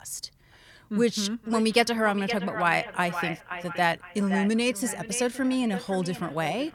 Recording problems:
echo of what is said; strong; throughout; 520 ms later, 10 dB below the speech

